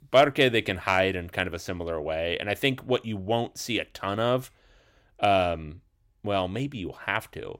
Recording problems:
none

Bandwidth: 16 kHz